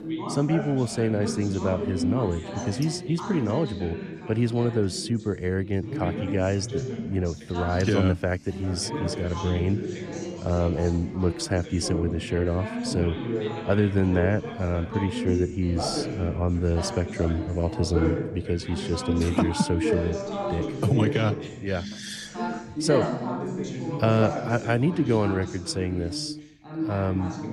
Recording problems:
background chatter; loud; throughout; 3 voices, 5 dB below the speech

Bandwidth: 14.5 kHz